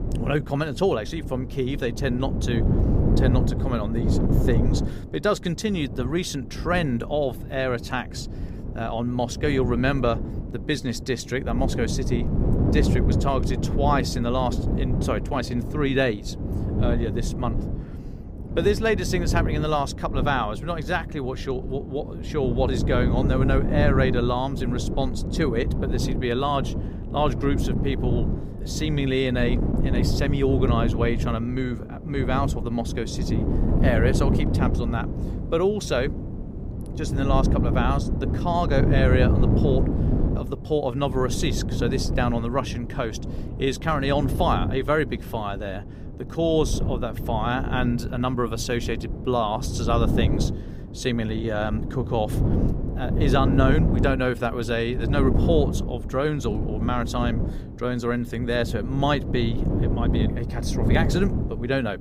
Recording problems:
wind noise on the microphone; heavy; 7 dB below the speech

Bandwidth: 15.5 kHz